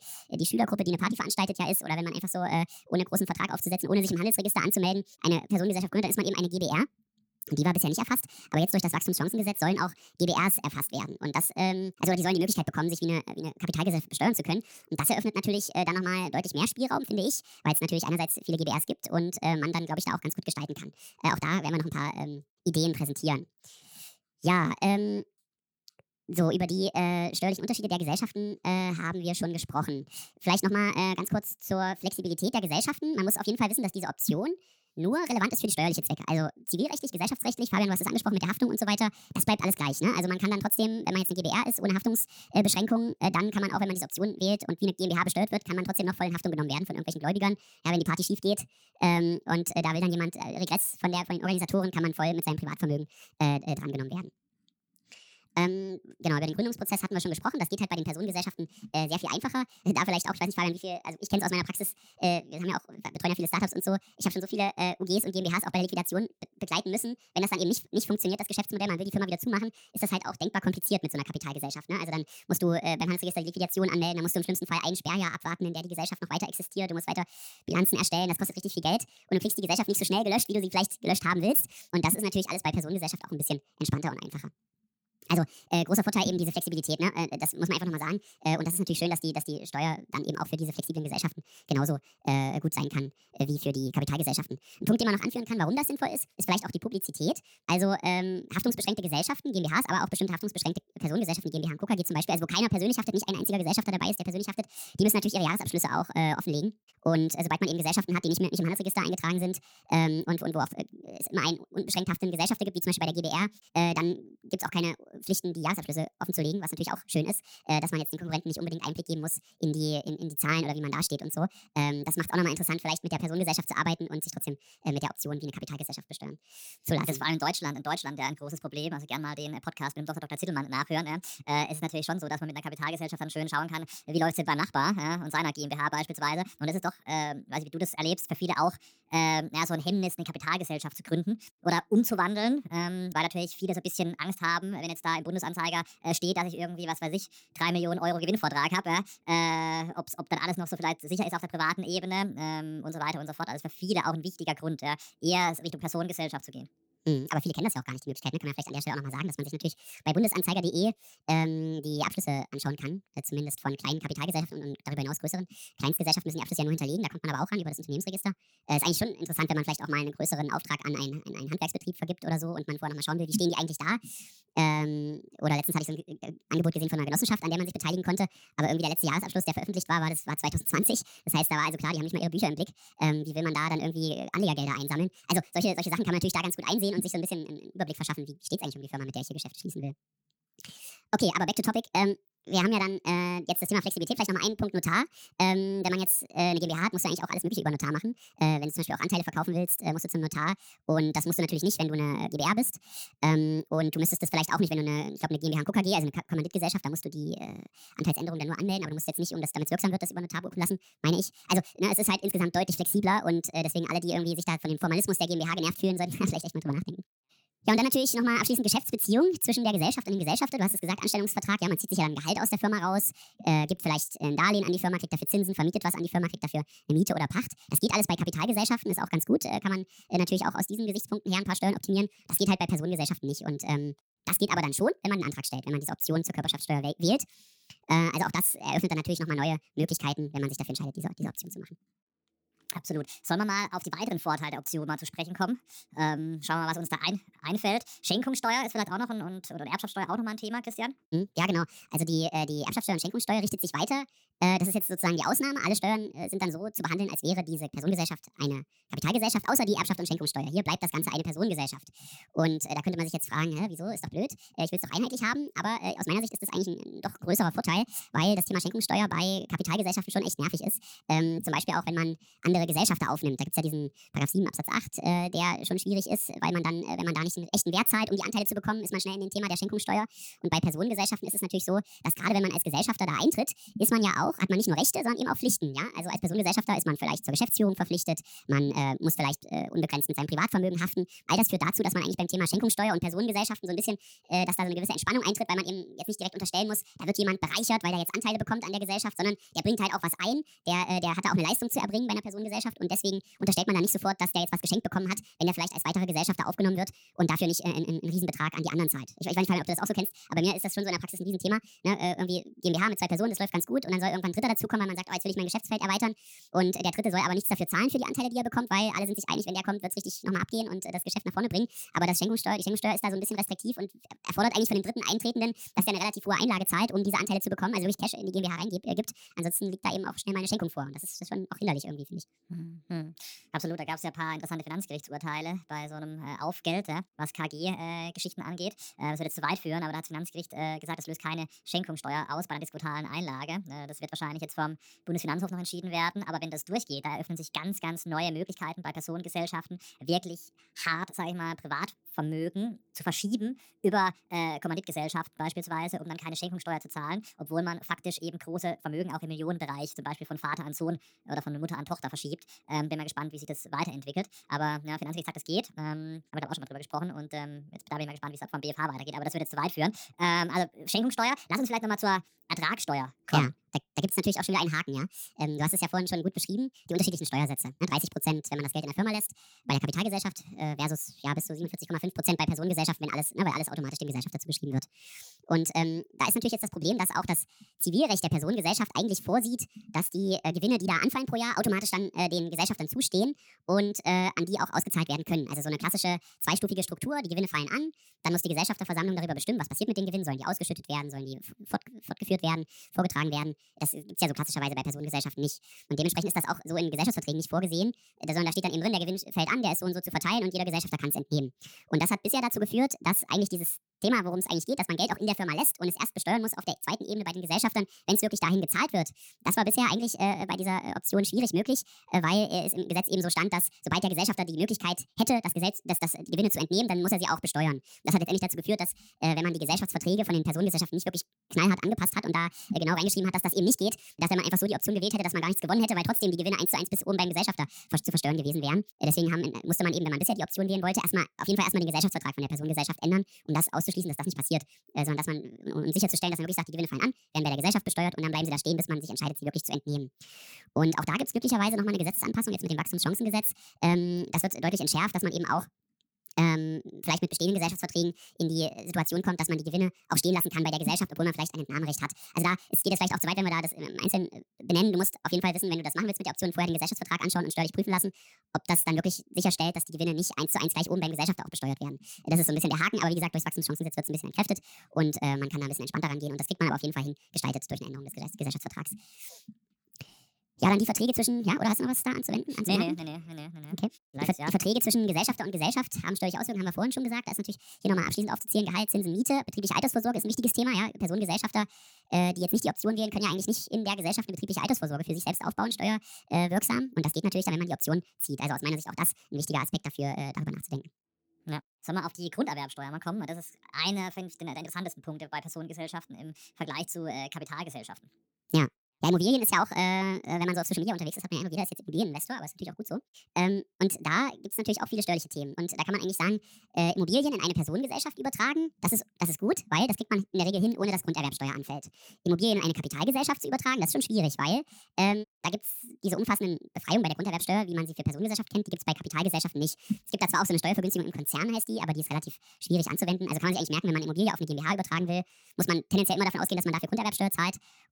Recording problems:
wrong speed and pitch; too fast and too high; 1.6 times normal speed

